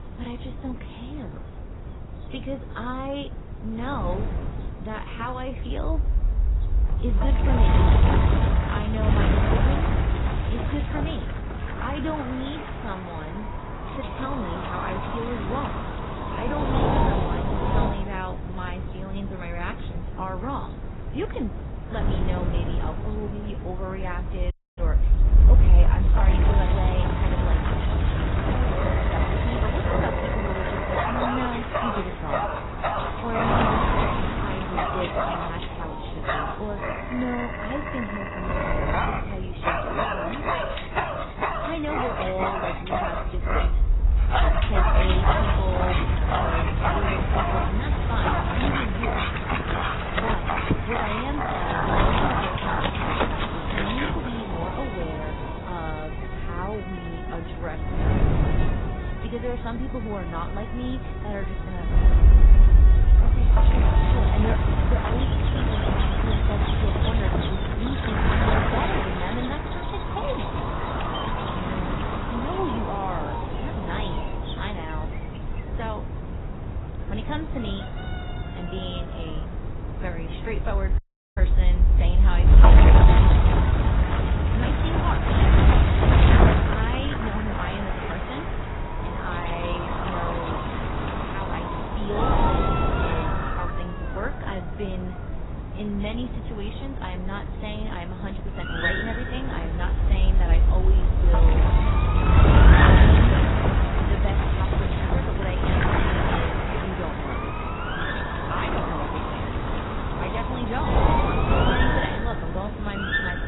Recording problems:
garbled, watery; badly; nothing above 4 kHz
animal sounds; very loud; throughout; 3 dB above the speech
wind noise on the microphone; heavy; 5 dB above the speech
audio cutting out; at 25 s and at 1:21

